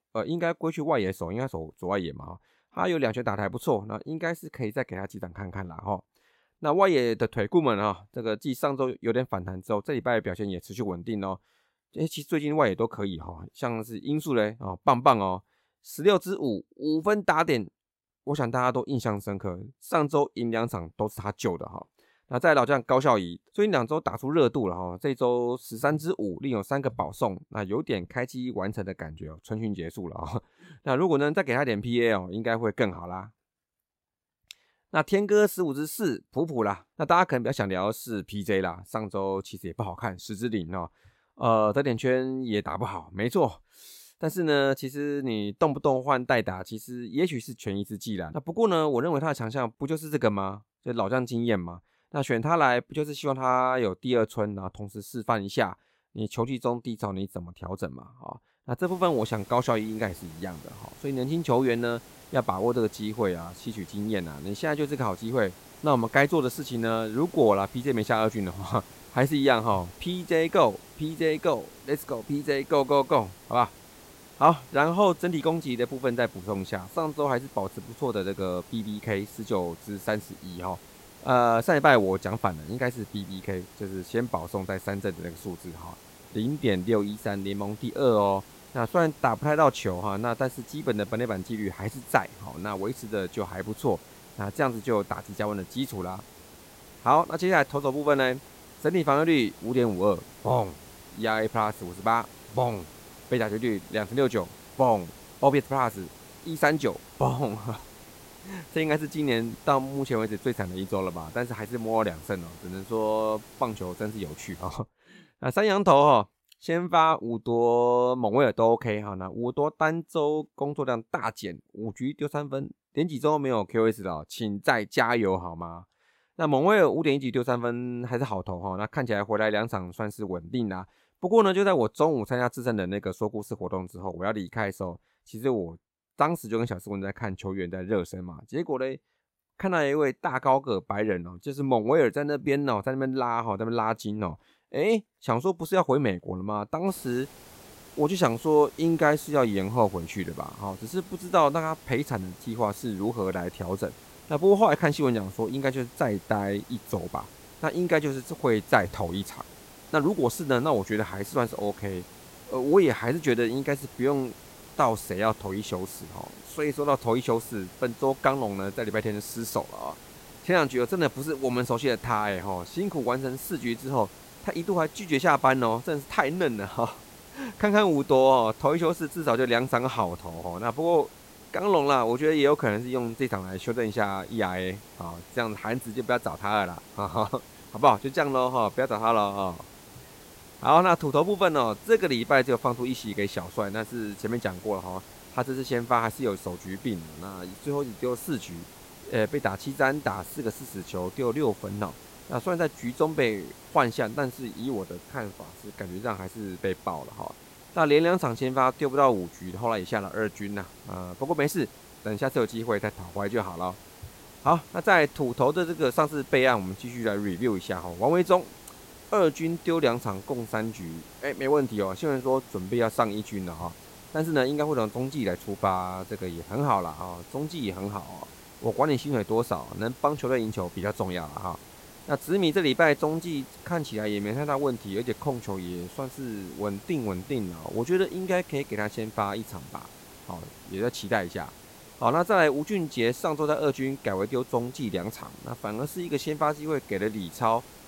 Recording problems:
hiss; faint; from 59 s to 1:55 and from 2:27 on; 20 dB below the speech

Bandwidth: 16 kHz